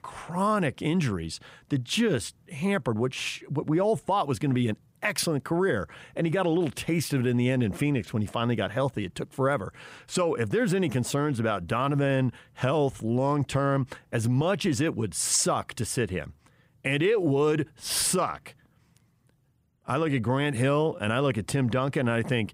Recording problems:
none

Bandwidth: 15.5 kHz